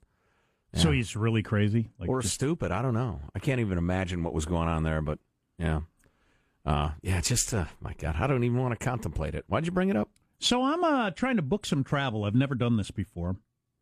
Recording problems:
none

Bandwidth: 14.5 kHz